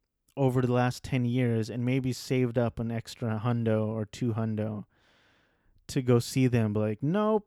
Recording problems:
none

